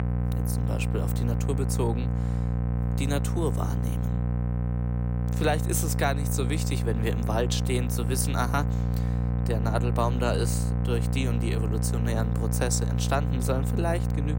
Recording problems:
electrical hum; loud; throughout; 60 Hz, 7 dB below the speech

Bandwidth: 16 kHz